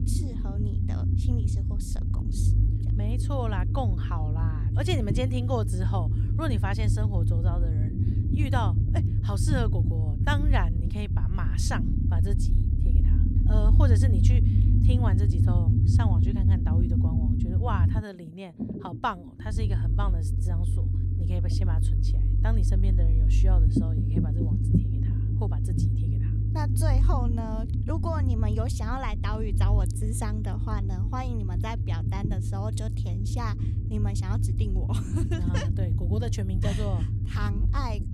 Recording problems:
low rumble; loud; throughout; 3 dB below the speech

